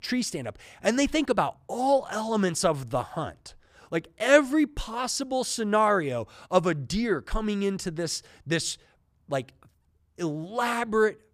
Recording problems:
none

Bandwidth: 15 kHz